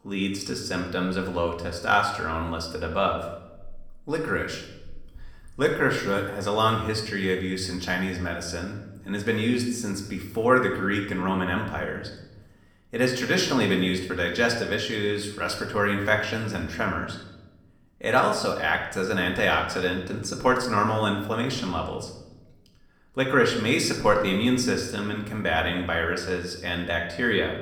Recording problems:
room echo; slight; dies away in 0.7 s
off-mic speech; somewhat distant

